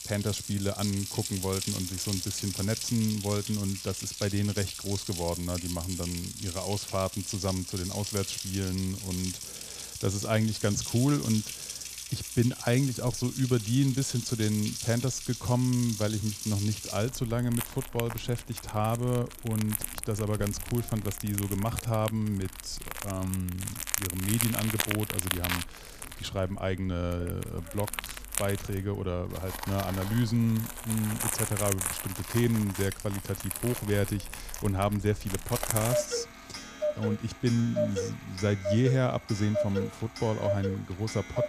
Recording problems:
household noises; loud; throughout; 5 dB below the speech

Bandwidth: 14.5 kHz